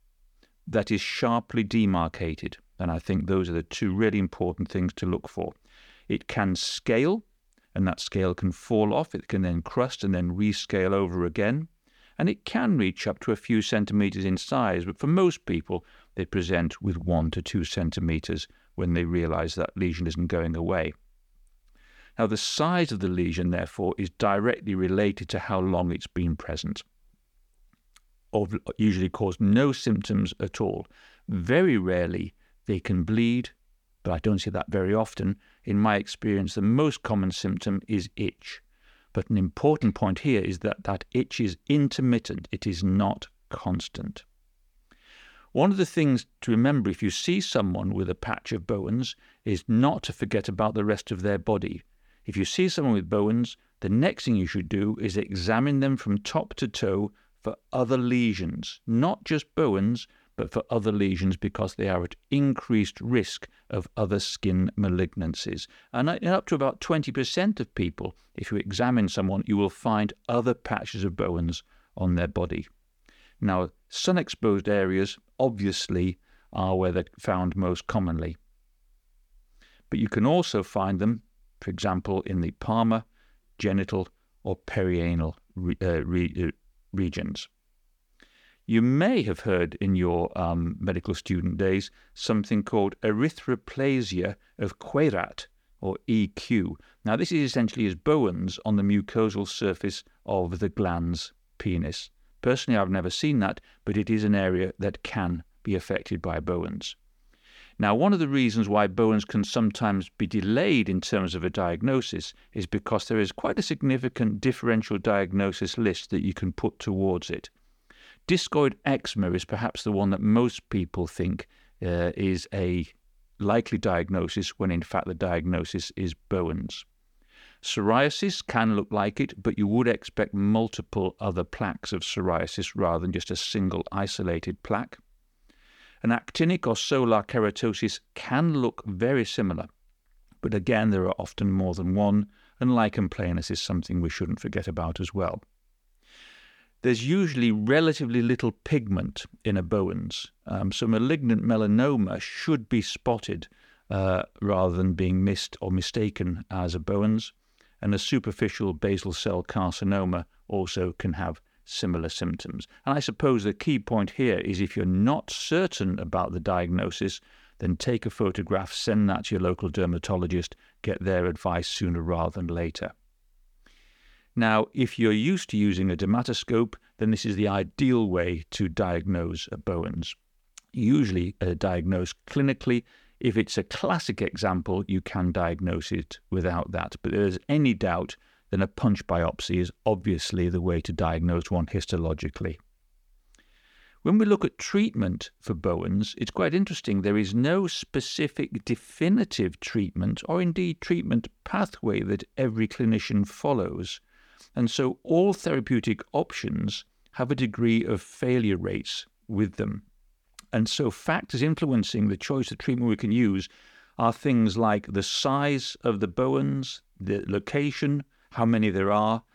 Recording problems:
none

